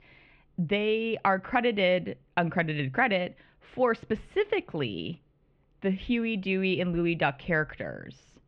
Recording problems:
muffled; very; fading above 3 kHz

